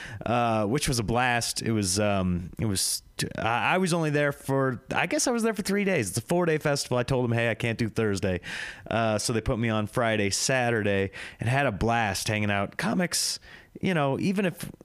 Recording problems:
squashed, flat; heavily

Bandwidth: 15 kHz